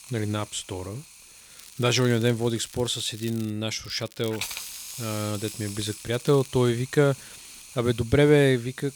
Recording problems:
hiss; noticeable; throughout; 15 dB below the speech
crackling; faint; from 1.5 to 3.5 s and from 4 to 6.5 s; 20 dB below the speech

